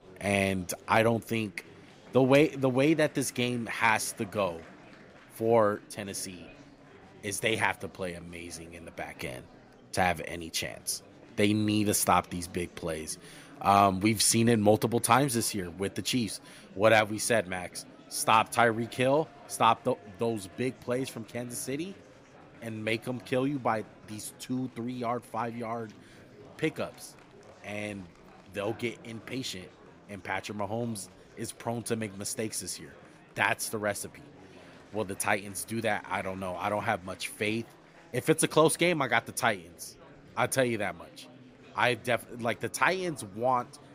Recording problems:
murmuring crowd; faint; throughout; 25 dB below the speech

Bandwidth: 15.5 kHz